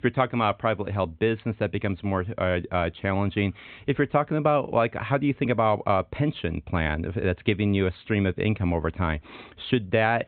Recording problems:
high frequencies cut off; severe; nothing above 4 kHz

